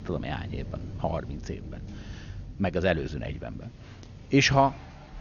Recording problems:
garbled, watery; slightly; nothing above 6.5 kHz
rain or running water; noticeable; throughout; 15 dB below the speech

